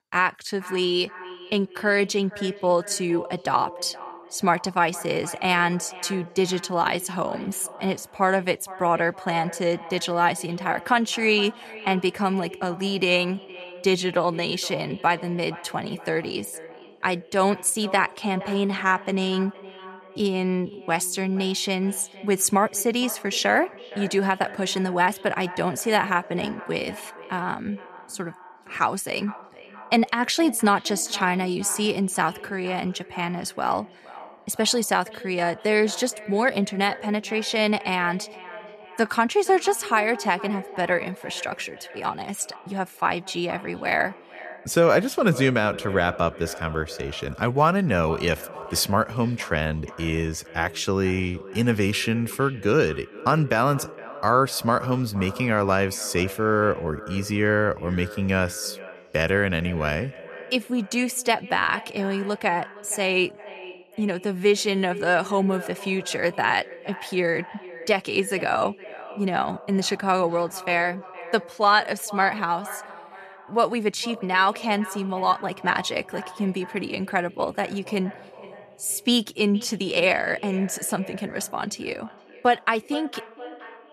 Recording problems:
echo of what is said; noticeable; throughout; 470 ms later, 15 dB below the speech

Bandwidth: 14 kHz